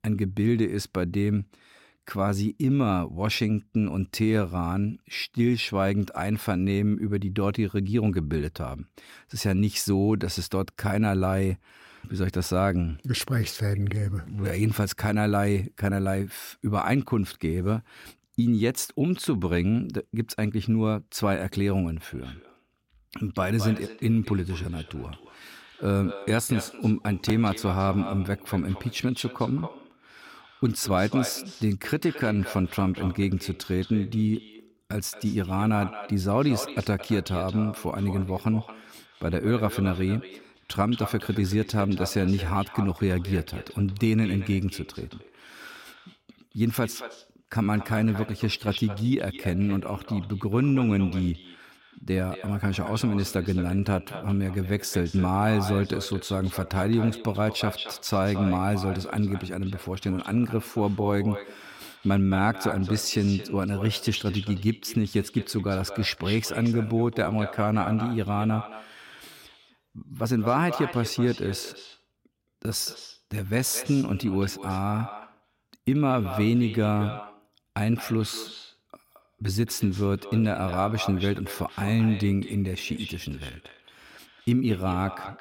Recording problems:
echo of what is said; noticeable; from 22 s on; 220 ms later, 15 dB below the speech

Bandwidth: 16.5 kHz